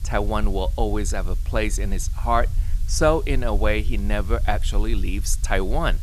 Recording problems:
hiss; faint; throughout; 25 dB below the speech
low rumble; faint; throughout; 25 dB below the speech

